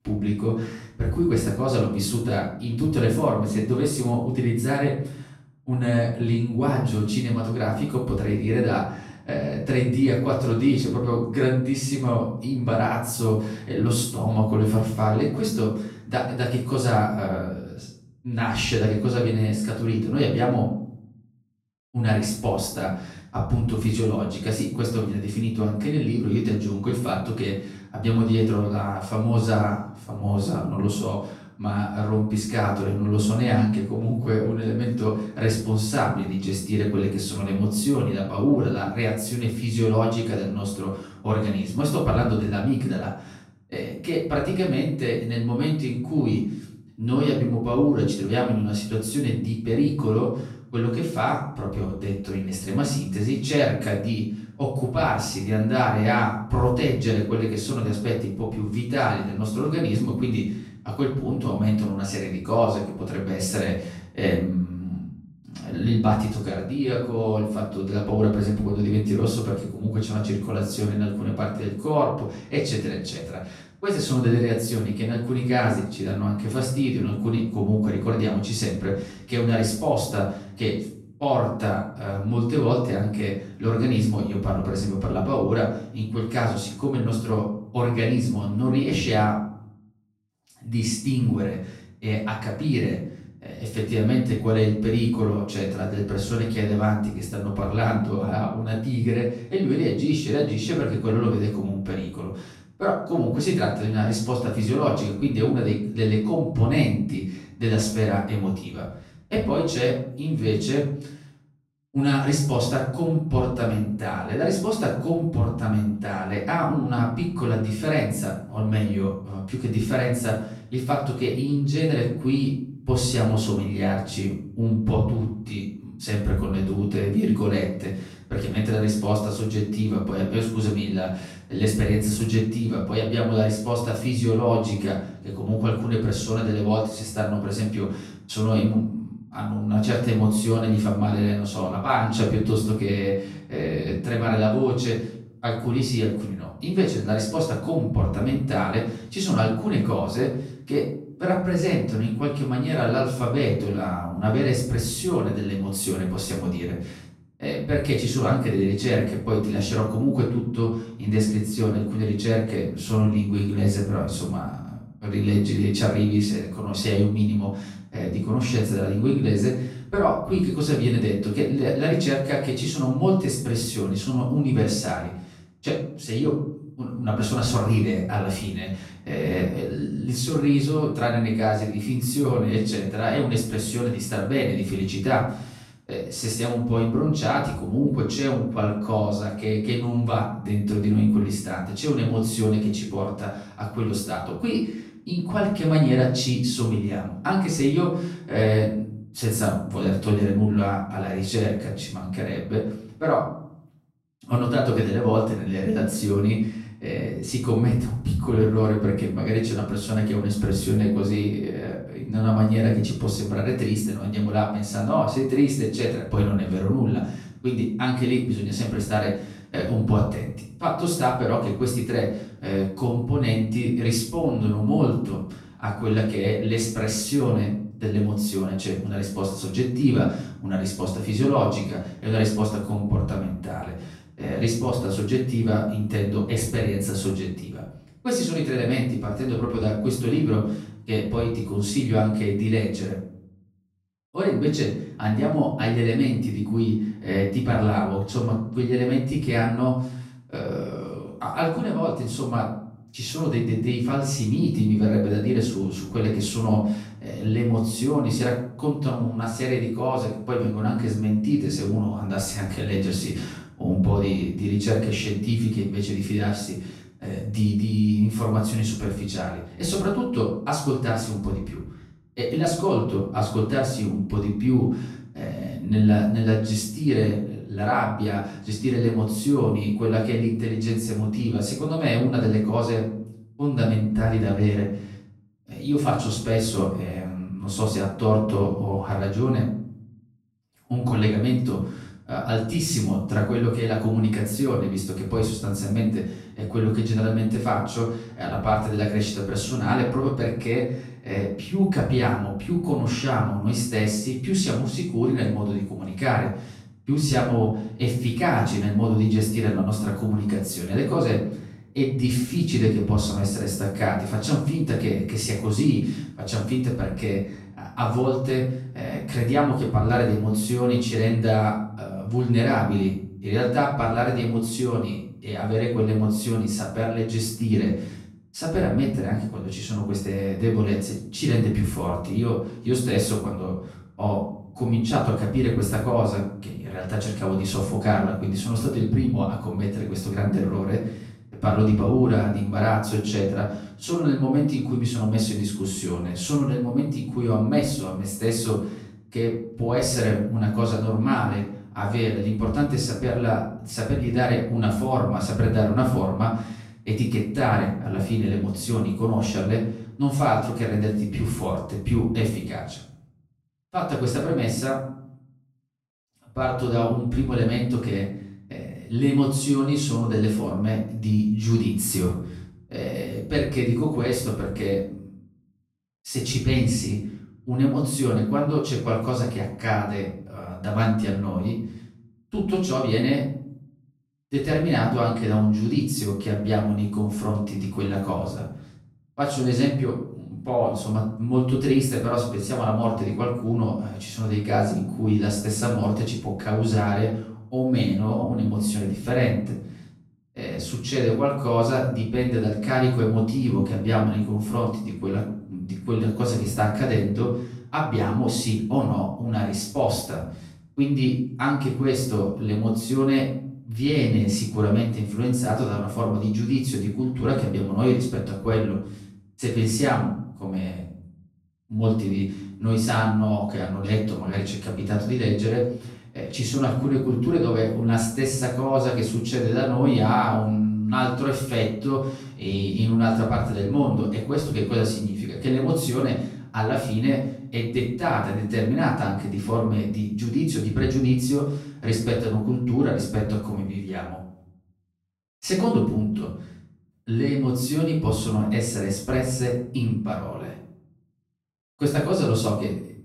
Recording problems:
off-mic speech; far
room echo; noticeable; dies away in 0.6 s

